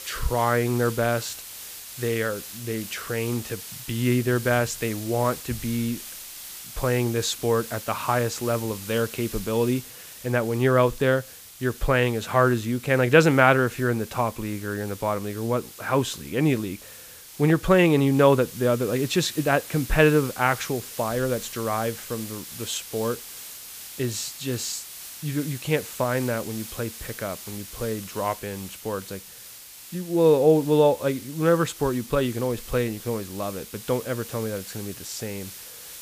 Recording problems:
hiss; noticeable; throughout; 15 dB below the speech

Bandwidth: 15 kHz